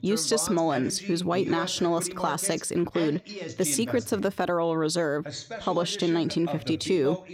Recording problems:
voice in the background; noticeable; throughout; 10 dB below the speech

